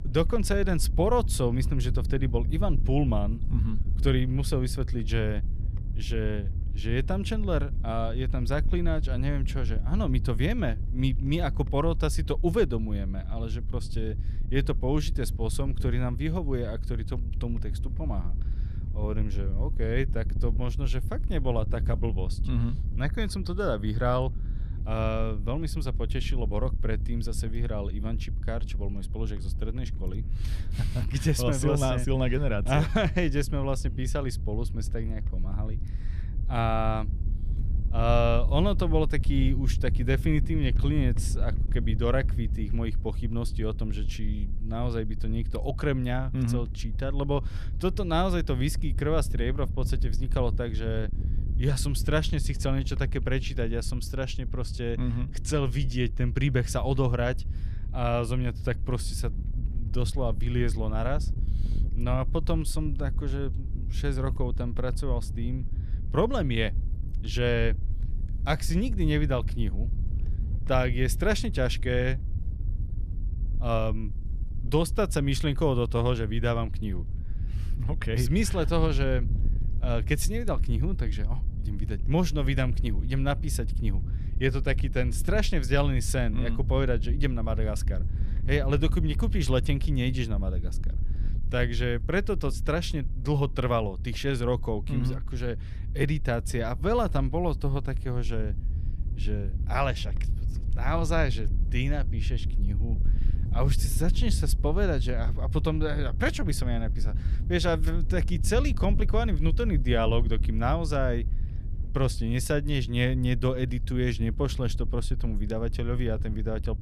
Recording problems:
wind noise on the microphone; occasional gusts; 15 dB below the speech

